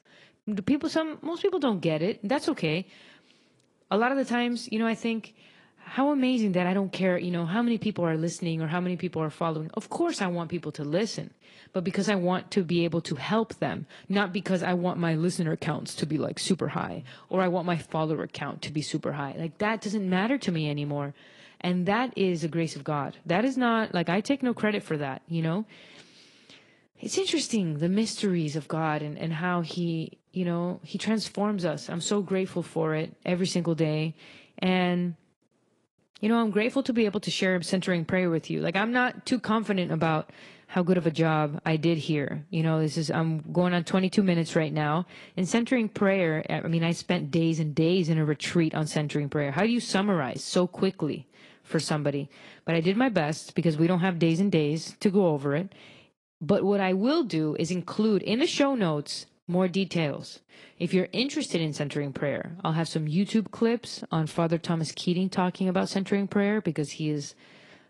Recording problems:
garbled, watery; slightly; nothing above 10.5 kHz

